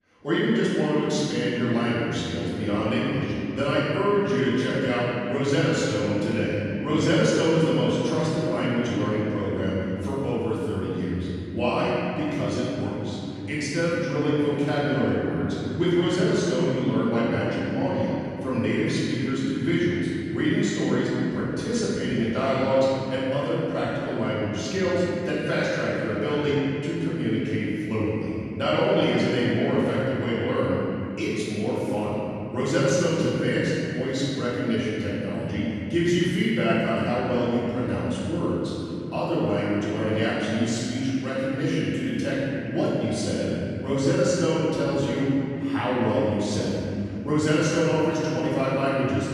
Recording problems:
room echo; strong; dies away in 3 s
off-mic speech; far

